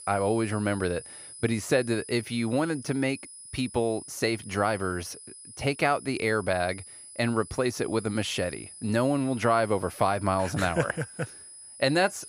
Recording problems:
high-pitched whine; noticeable; throughout; 10.5 kHz, 15 dB below the speech

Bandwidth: 15.5 kHz